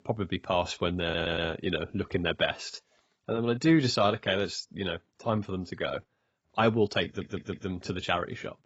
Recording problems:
garbled, watery; badly; nothing above 7.5 kHz
audio stuttering; at 1 s and at 7 s

